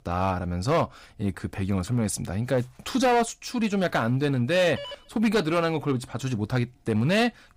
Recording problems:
distortion; slight; 6% of the sound clipped
phone ringing; faint; at 5 s; peak 15 dB below the speech

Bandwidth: 15.5 kHz